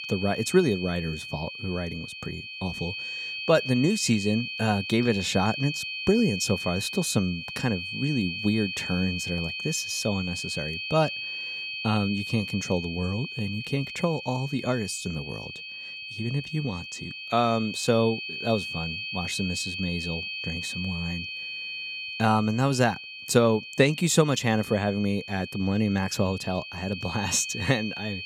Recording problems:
high-pitched whine; loud; throughout; 2.5 kHz, 6 dB below the speech

